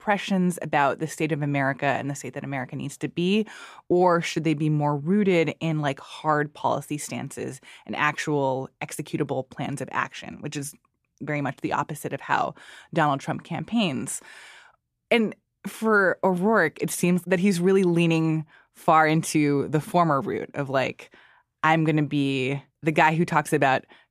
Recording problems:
none

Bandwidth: 15 kHz